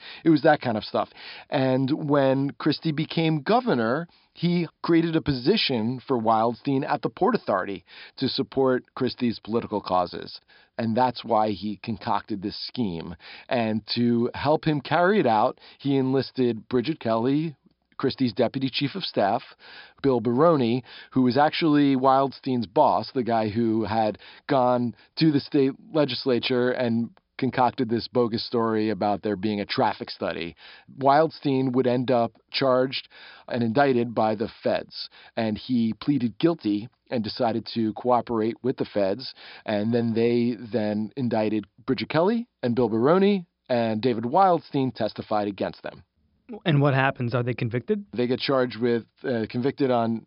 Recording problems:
high frequencies cut off; noticeable; nothing above 5.5 kHz

